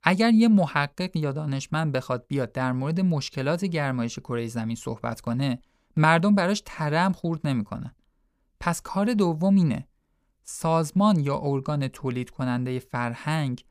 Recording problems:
none

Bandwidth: 15 kHz